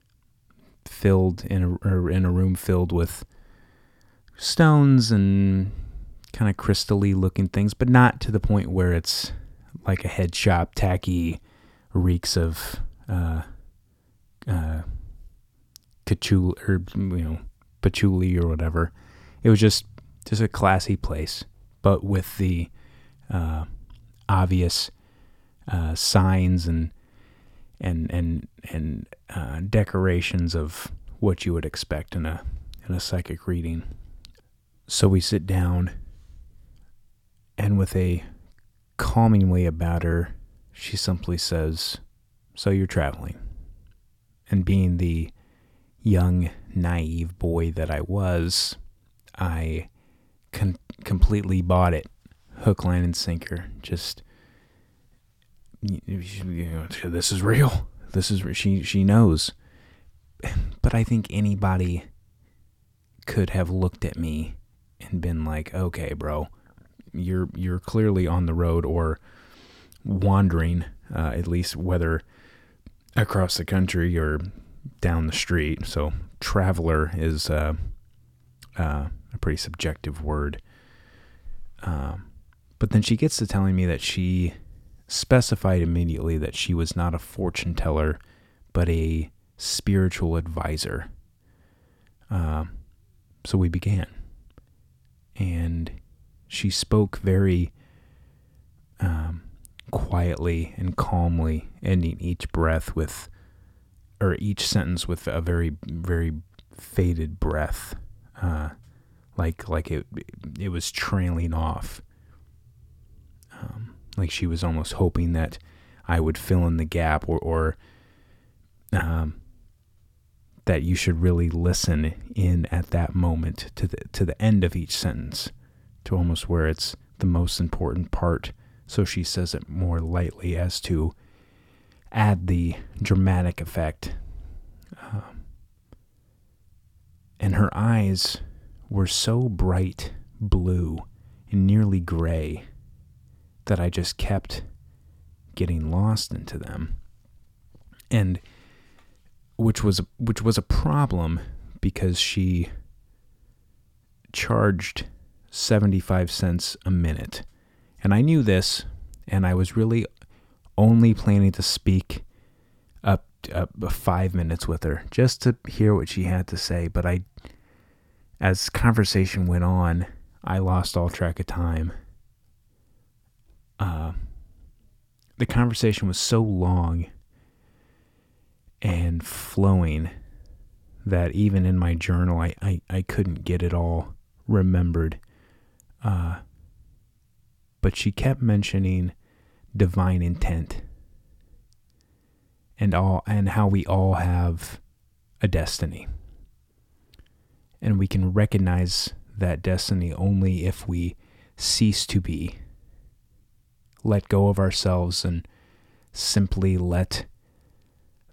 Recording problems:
none

